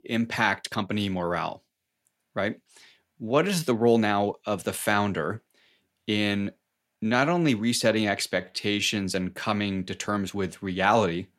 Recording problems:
uneven, jittery; strongly; from 0.5 to 10 s

